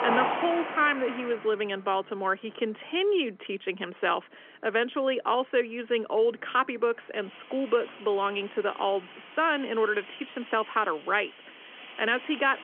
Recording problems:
phone-call audio; nothing above 3.5 kHz
traffic noise; loud; throughout; 10 dB below the speech

